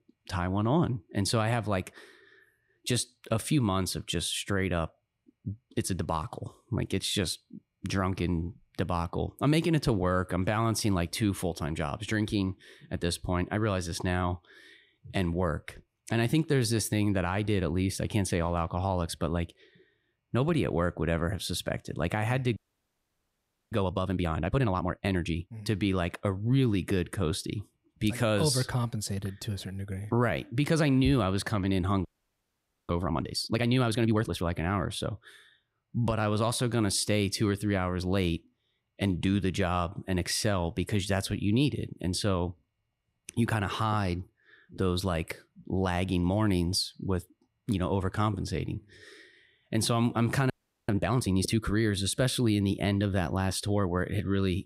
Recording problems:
audio freezing; at 23 s for 1 s, at 32 s for 1 s and at 51 s

